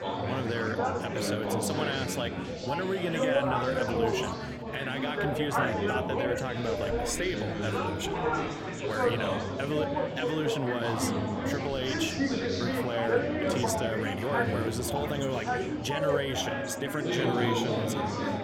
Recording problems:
chatter from many people; very loud; throughout; 3 dB above the speech

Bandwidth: 16.5 kHz